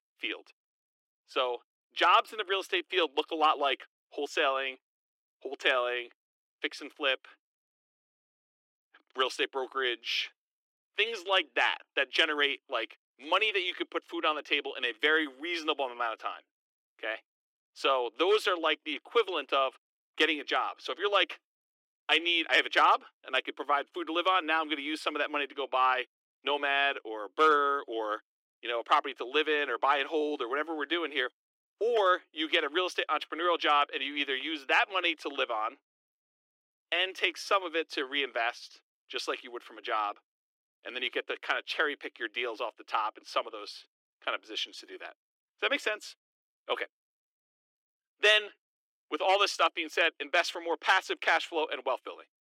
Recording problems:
thin; very; fading below 300 Hz

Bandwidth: 16 kHz